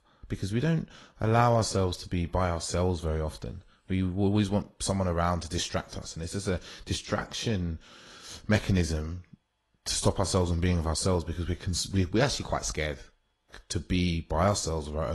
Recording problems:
garbled, watery; slightly; nothing above 11 kHz
abrupt cut into speech; at the end

